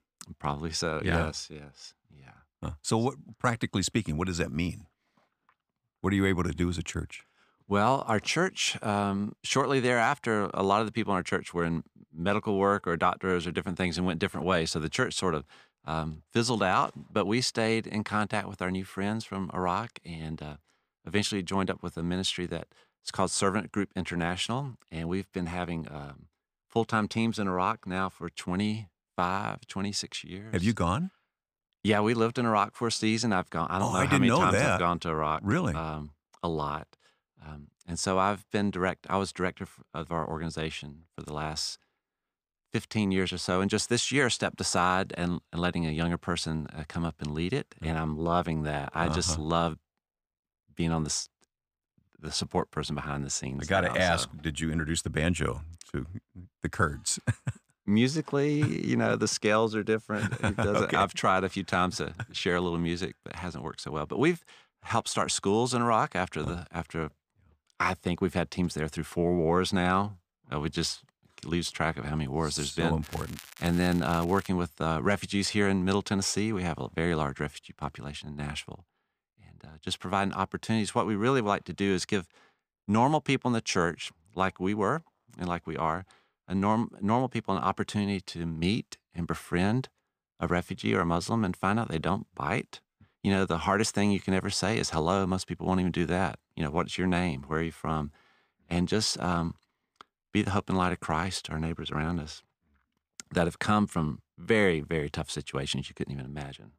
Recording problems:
crackling; noticeable; from 1:13 to 1:14; 15 dB below the speech

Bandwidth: 15 kHz